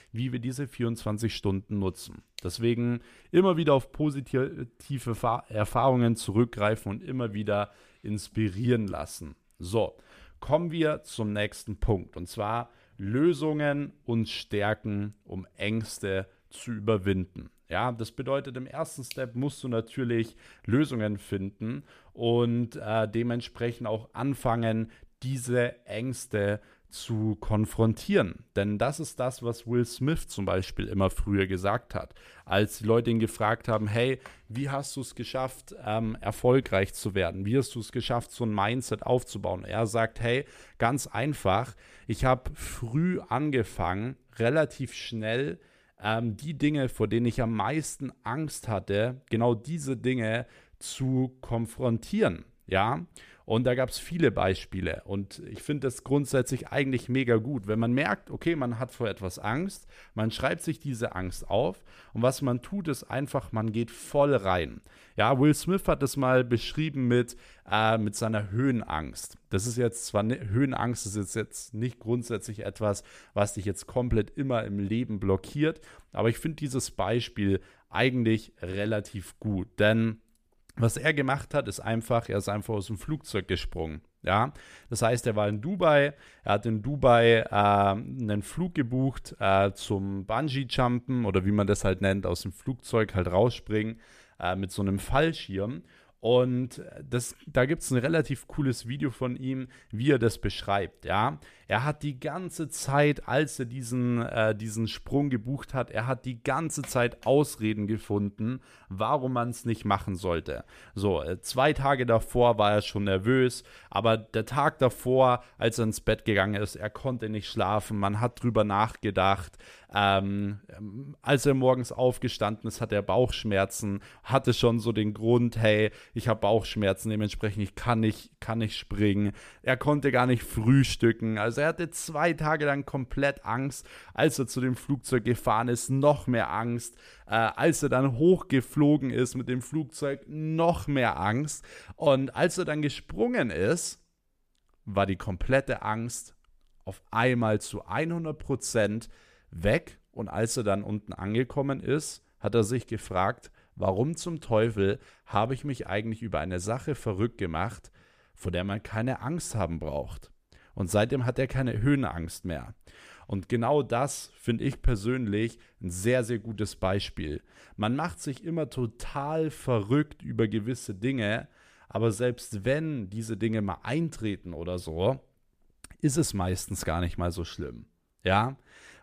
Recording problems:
none

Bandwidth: 14.5 kHz